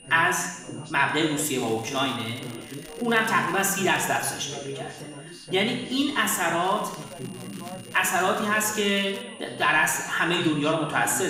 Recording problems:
room echo; noticeable; dies away in 0.9 s
off-mic speech; somewhat distant
background chatter; noticeable; throughout; 4 voices, 15 dB below the speech
high-pitched whine; faint; throughout; 3 kHz, 25 dB below the speech
crackling; faint; from 1.5 to 4 s and from 6.5 to 9 s; 25 dB below the speech
abrupt cut into speech; at the end

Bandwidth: 15.5 kHz